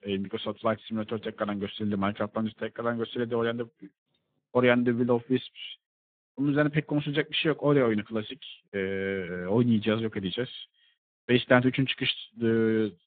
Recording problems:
phone-call audio; nothing above 3.5 kHz

